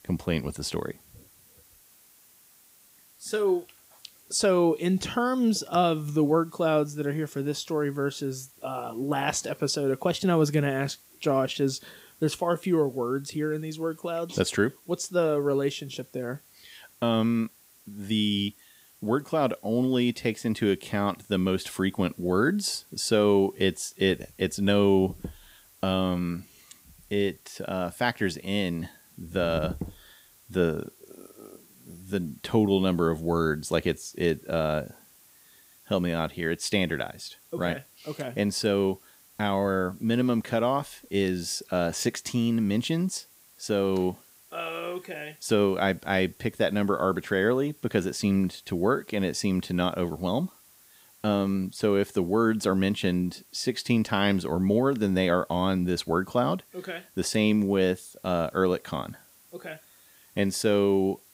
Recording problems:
hiss; faint; throughout; 25 dB below the speech

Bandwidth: 15.5 kHz